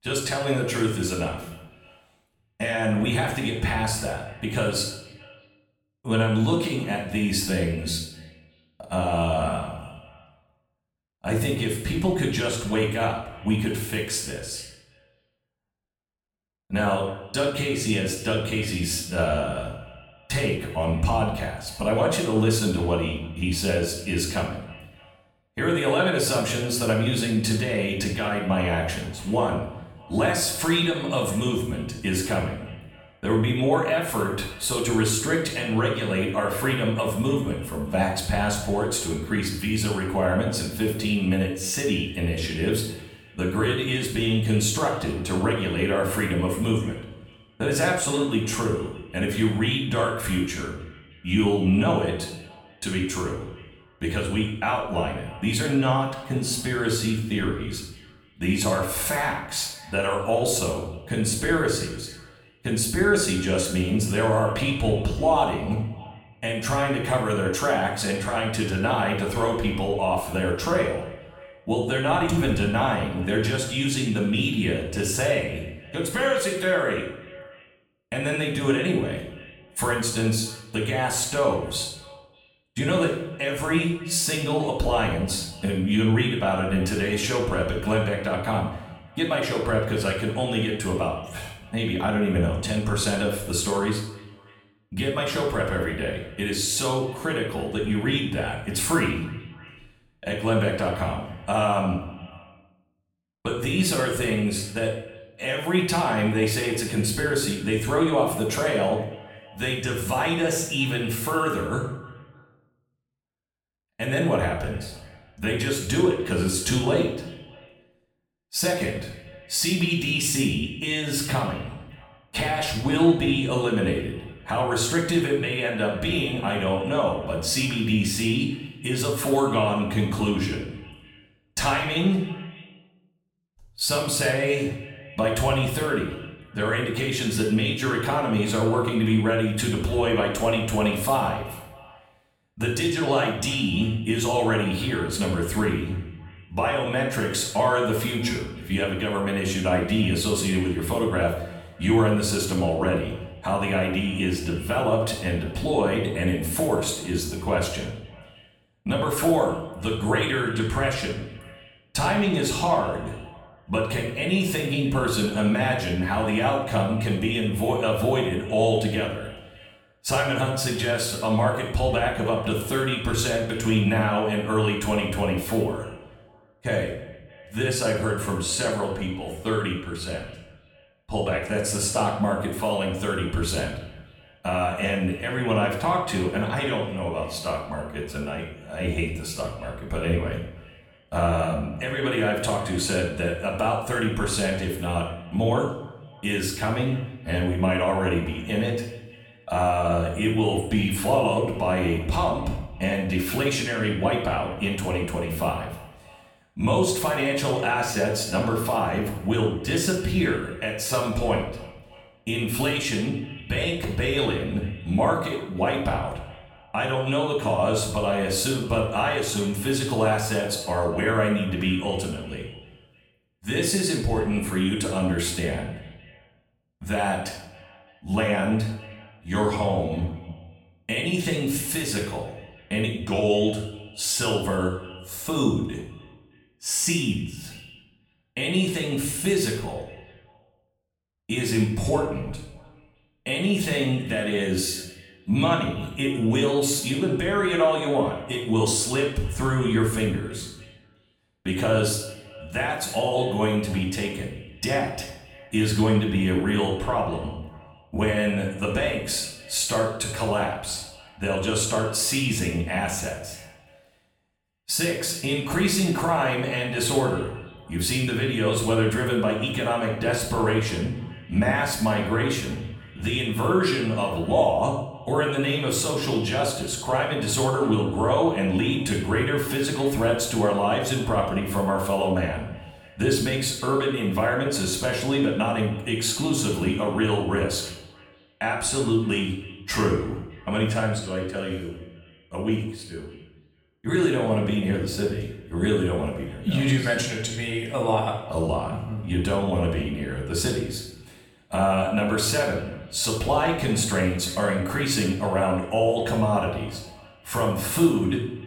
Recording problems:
off-mic speech; far
room echo; noticeable; dies away in 0.6 s
echo of what is said; faint; throughout; 310 ms later, 20 dB below the speech

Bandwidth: 17.5 kHz